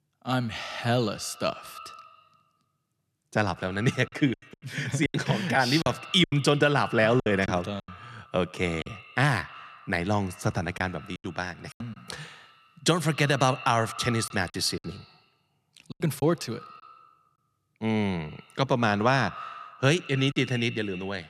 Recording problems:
echo of what is said; noticeable; throughout; 90 ms later, 15 dB below the speech
choppy; very; 7% of the speech affected

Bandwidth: 13.5 kHz